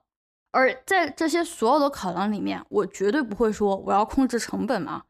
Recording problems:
none

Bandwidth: 14.5 kHz